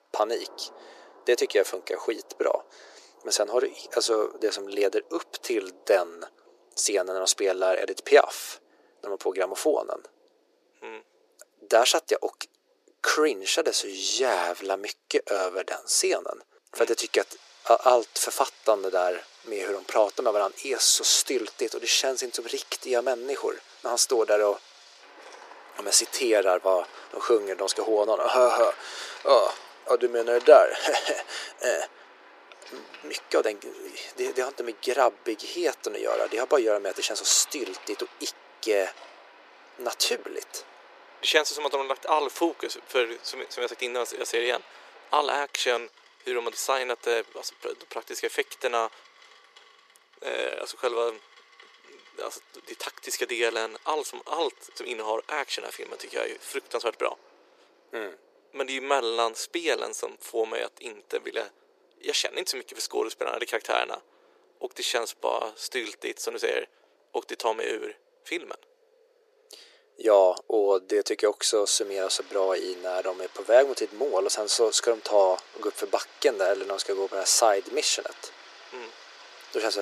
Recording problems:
thin; very; fading below 350 Hz
rain or running water; faint; throughout; 25 dB below the speech
abrupt cut into speech; at the end

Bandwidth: 14.5 kHz